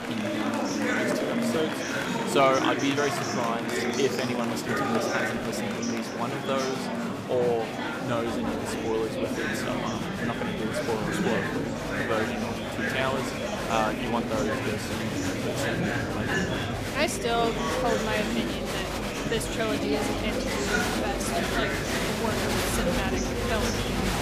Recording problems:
murmuring crowd; very loud; throughout; 2 dB above the speech

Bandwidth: 15 kHz